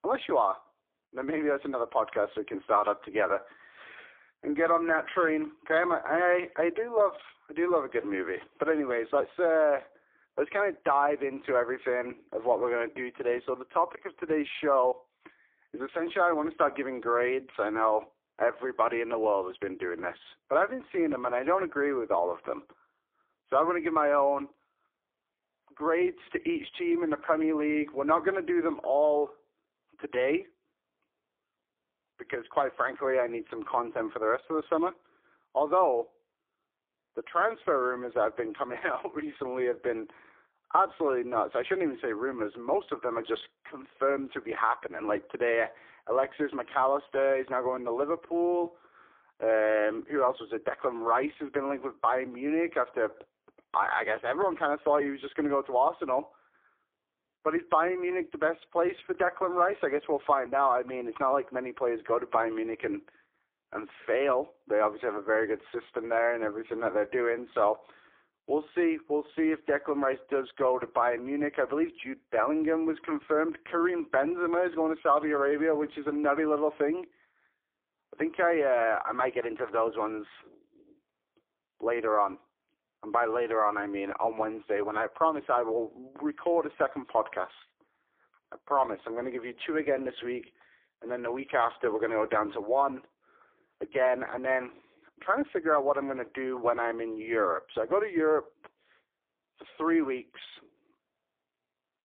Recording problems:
phone-call audio; poor line

